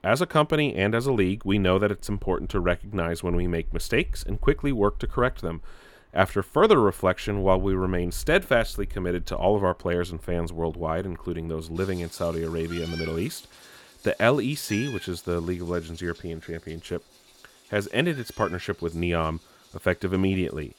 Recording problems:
animal sounds; noticeable; throughout; 15 dB below the speech

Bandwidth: 18 kHz